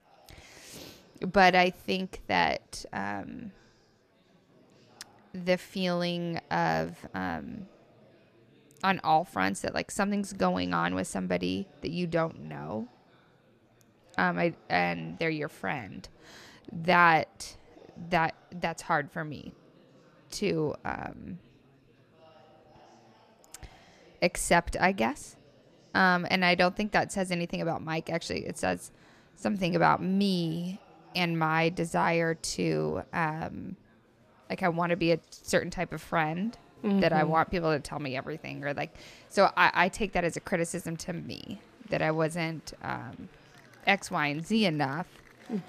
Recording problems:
murmuring crowd; faint; throughout; 30 dB below the speech

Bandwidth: 14.5 kHz